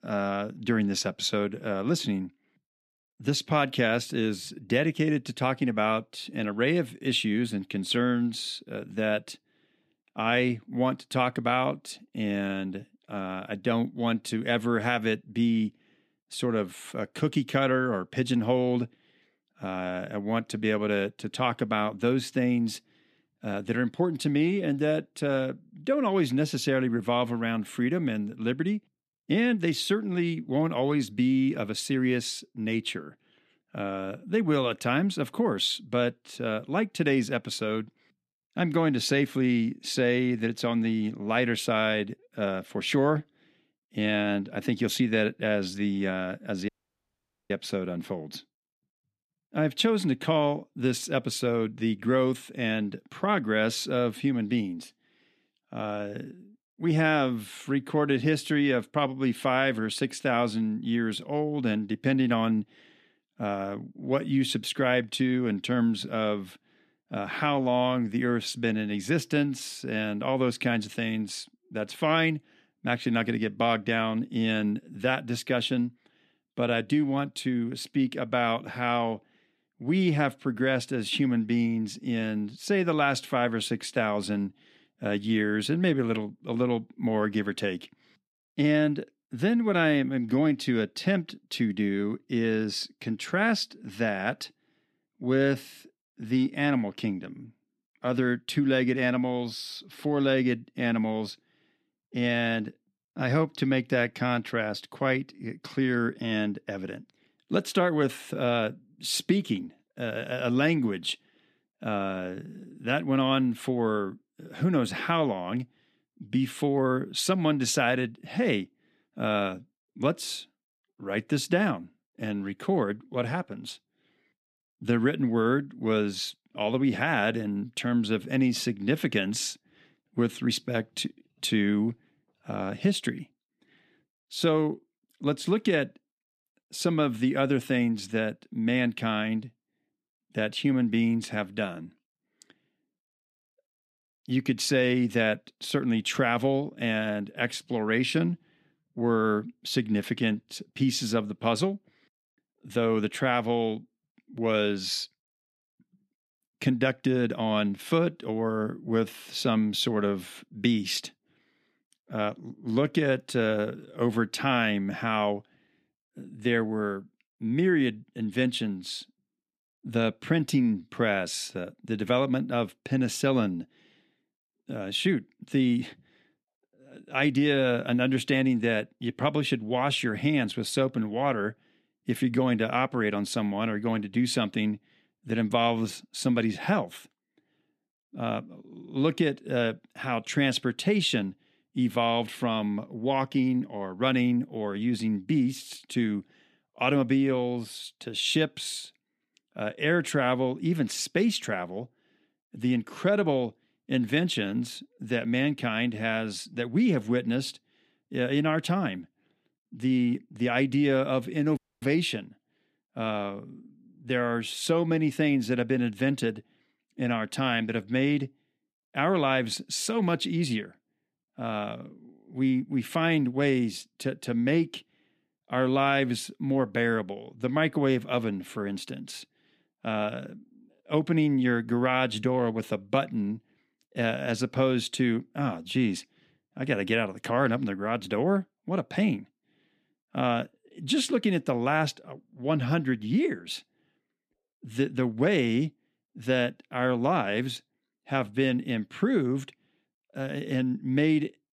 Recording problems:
audio cutting out; at 47 s for 1 s and at 3:32

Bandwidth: 14.5 kHz